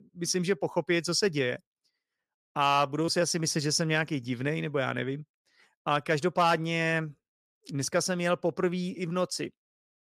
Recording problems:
none

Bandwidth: 15 kHz